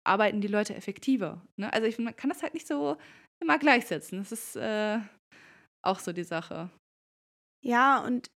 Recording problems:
none

